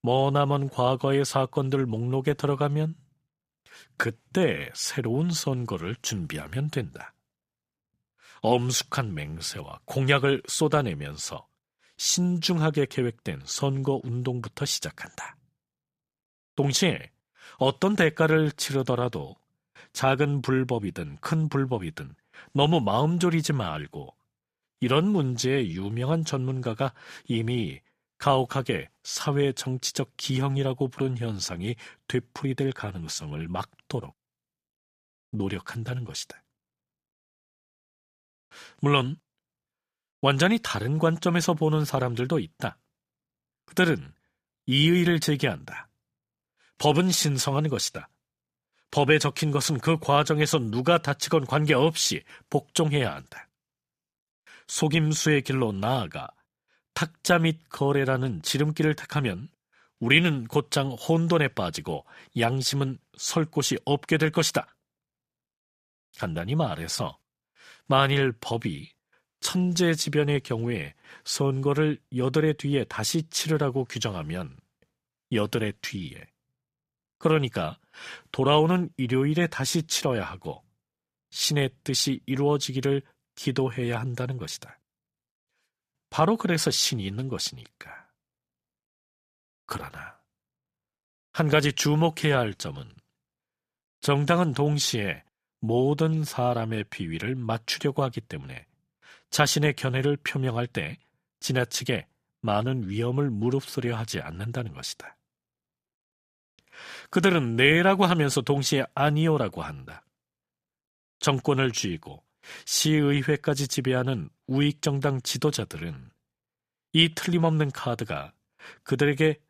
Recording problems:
none

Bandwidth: 15 kHz